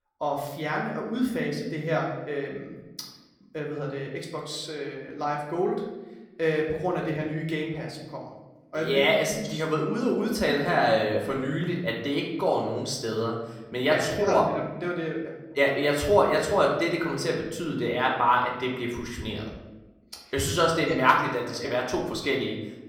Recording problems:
room echo; slight; dies away in 0.9 s
off-mic speech; somewhat distant

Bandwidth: 17 kHz